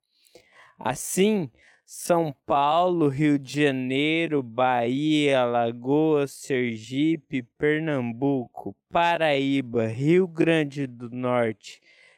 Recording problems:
wrong speed, natural pitch; too slow; 0.6 times normal speed

